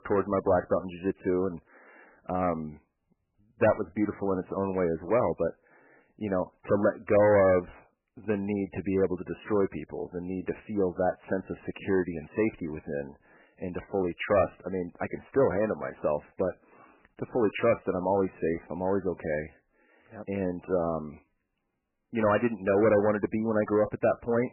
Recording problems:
garbled, watery; badly; nothing above 3 kHz
distortion; slight; 3% of the sound clipped

